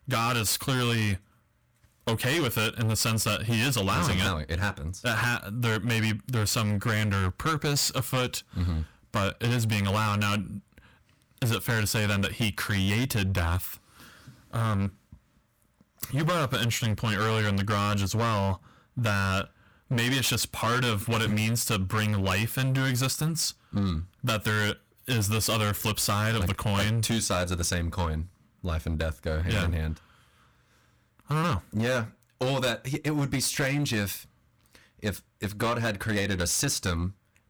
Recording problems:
distortion; heavy; 17% of the sound clipped

